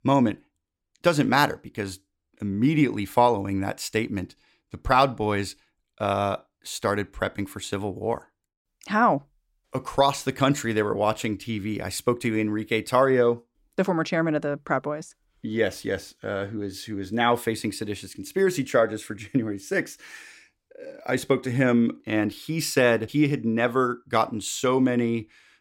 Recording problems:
none

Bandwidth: 16.5 kHz